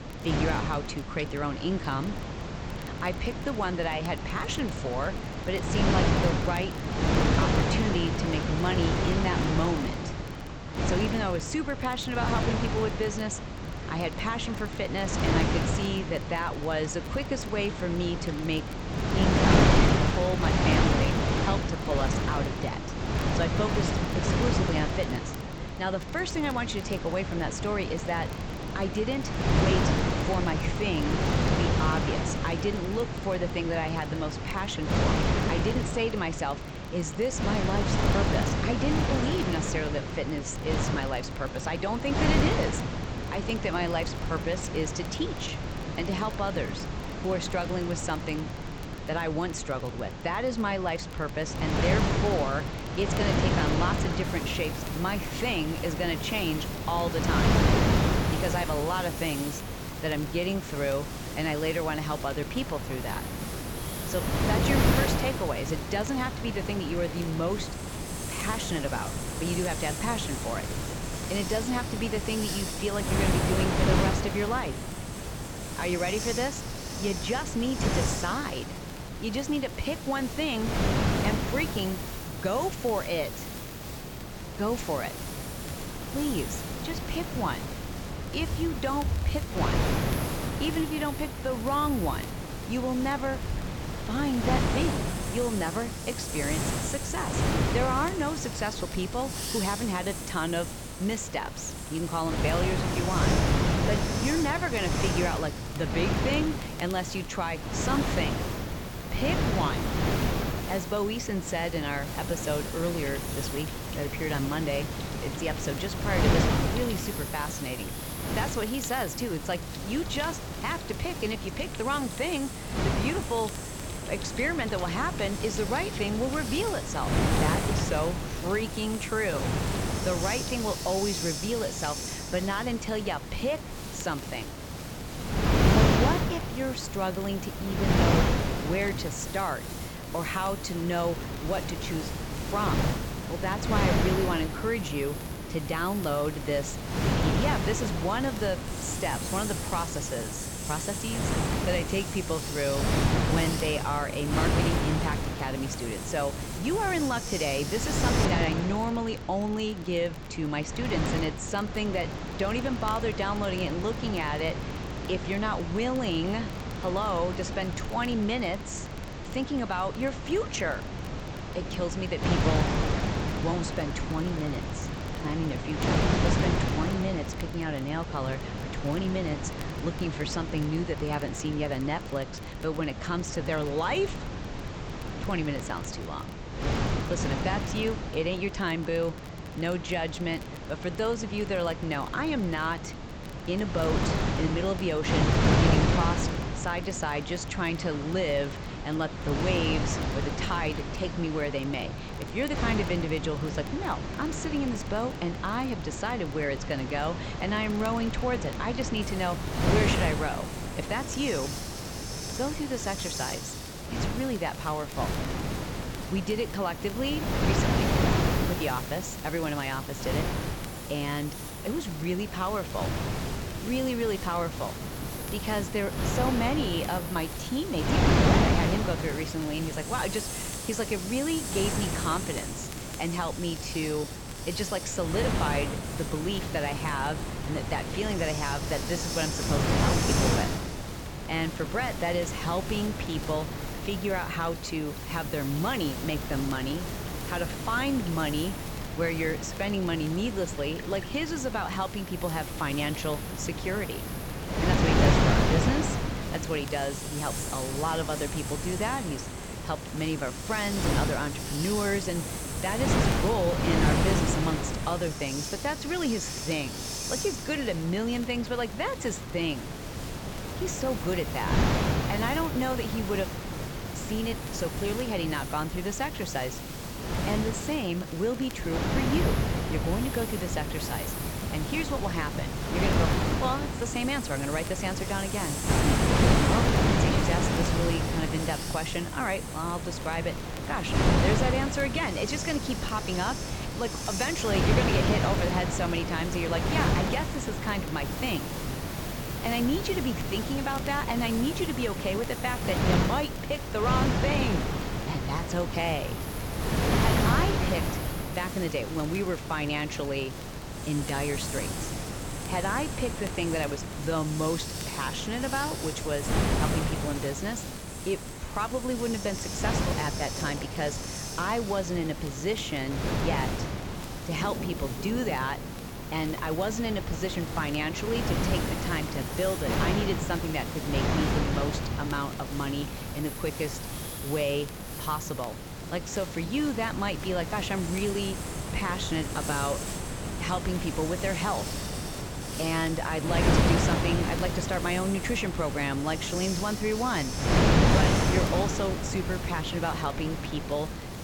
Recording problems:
high frequencies cut off; noticeable; nothing above 8 kHz
wind noise on the microphone; heavy; 2 dB below the speech
hiss; loud; from 54 s to 2:38 and from 3:29 on; 8 dB below the speech
rain or running water; noticeable; throughout; 20 dB below the speech
crackle, like an old record; faint; 25 dB below the speech

